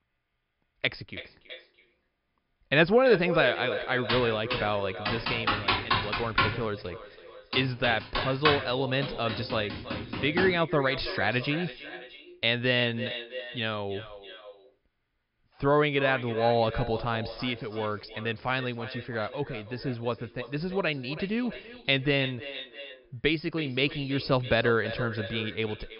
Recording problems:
echo of what is said; strong; throughout; 330 ms later, 10 dB below the speech
high frequencies cut off; noticeable; nothing above 5.5 kHz
keyboard typing; loud; from 4 to 11 s; peak 3 dB above the speech

